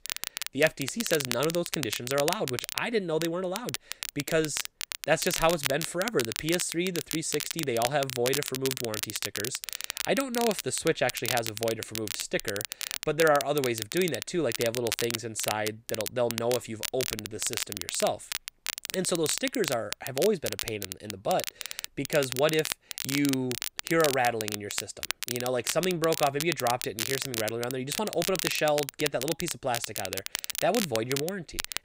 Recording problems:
crackle, like an old record; loud; 4 dB below the speech

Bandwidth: 15.5 kHz